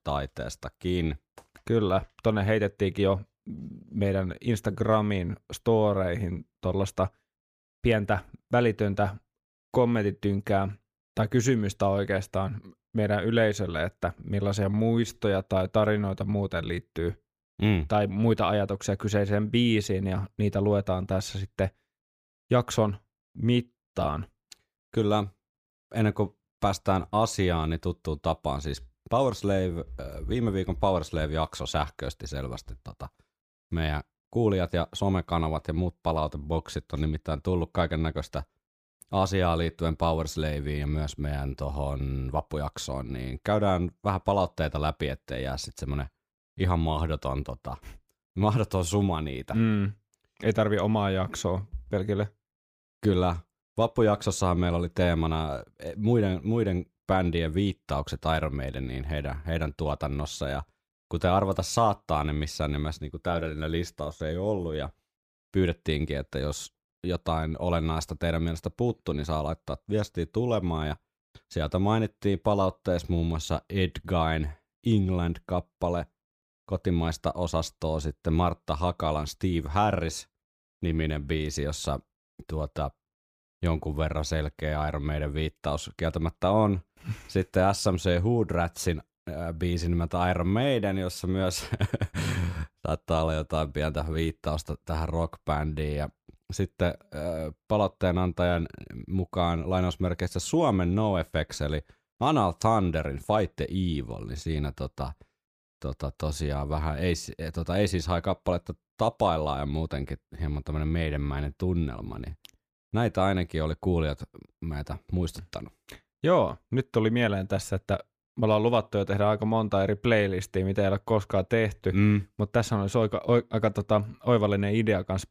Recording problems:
none

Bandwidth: 15 kHz